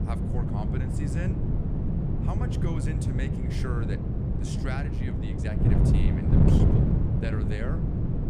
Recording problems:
wind noise on the microphone; heavy; 4 dB above the speech

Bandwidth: 15 kHz